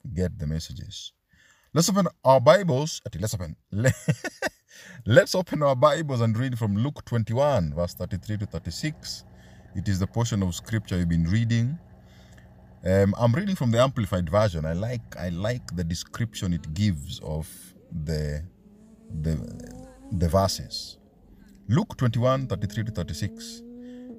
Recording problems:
traffic noise; faint; from 7.5 s on; 25 dB below the speech

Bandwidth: 15 kHz